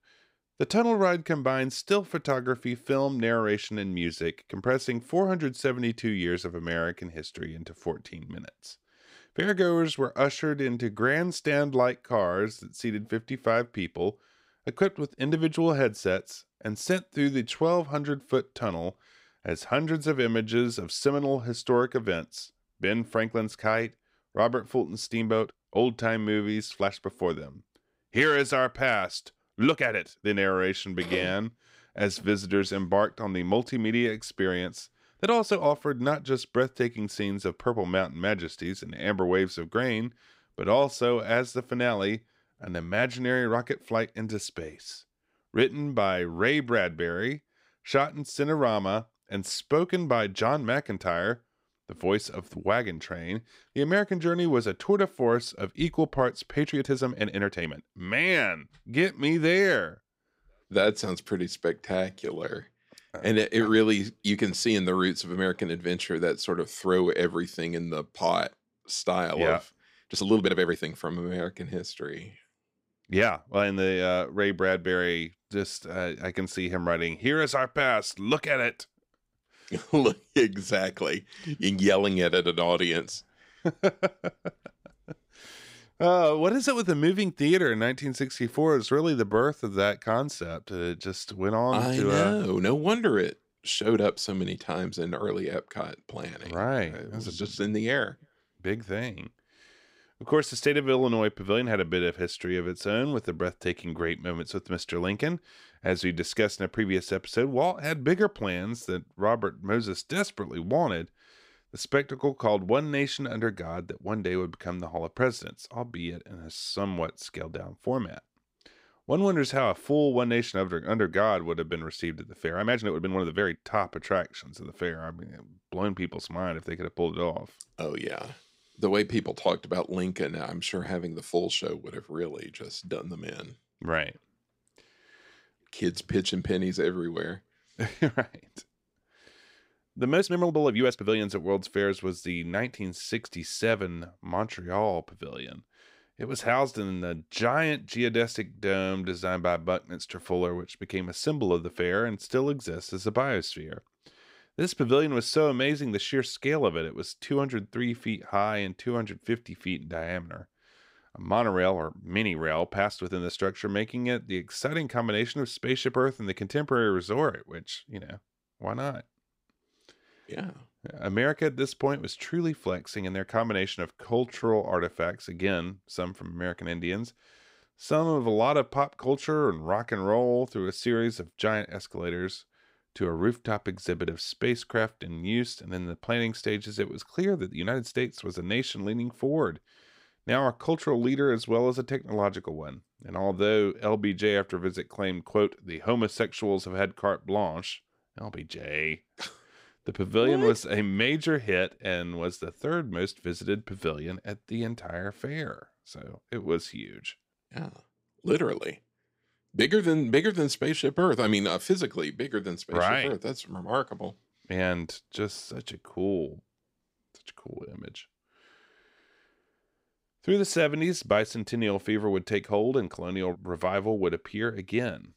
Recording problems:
uneven, jittery; strongly; from 10 s to 3:38

